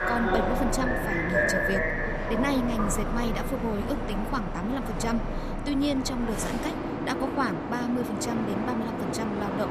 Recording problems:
train or aircraft noise; very loud; throughout; 1 dB above the speech

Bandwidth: 14.5 kHz